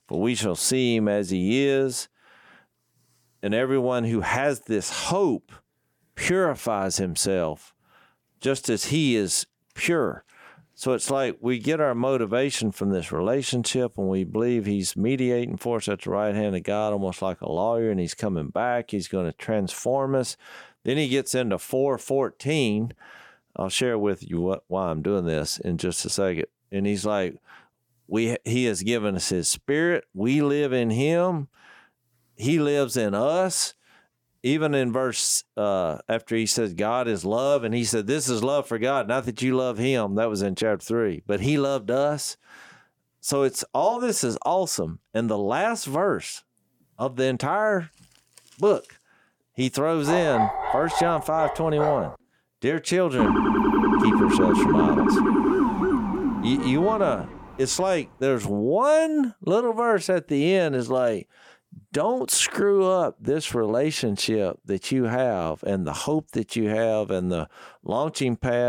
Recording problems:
dog barking; loud; from 50 to 52 s; peak level with the speech
siren; loud; from 53 to 57 s; peak 5 dB above the speech
abrupt cut into speech; at the end

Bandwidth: 18 kHz